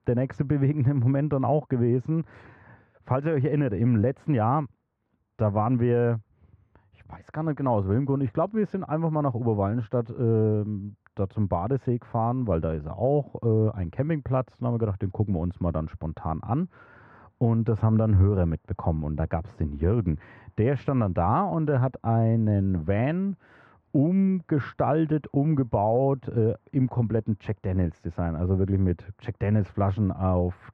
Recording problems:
muffled; very; fading above 1.5 kHz

